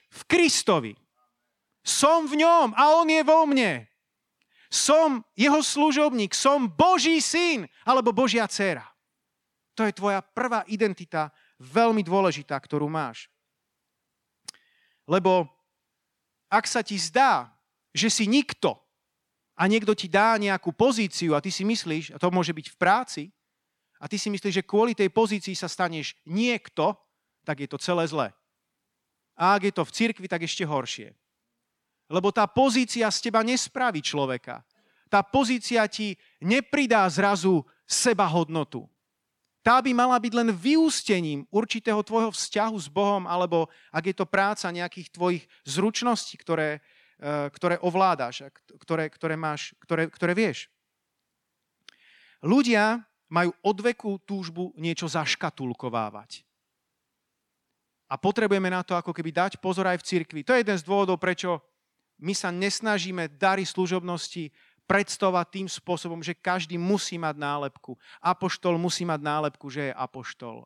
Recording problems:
none

